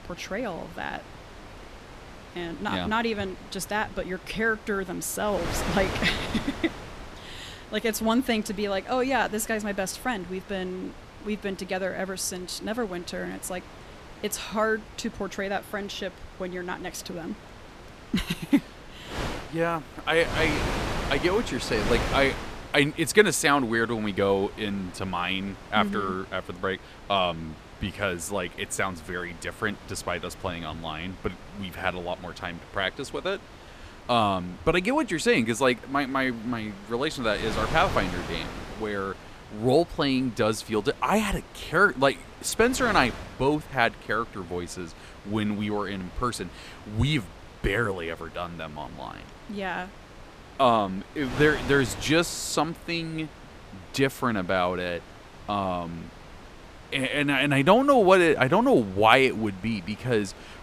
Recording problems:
wind noise on the microphone; occasional gusts; 15 dB below the speech

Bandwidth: 14.5 kHz